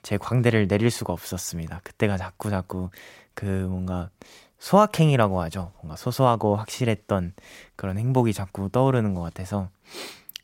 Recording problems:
none

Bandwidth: 16 kHz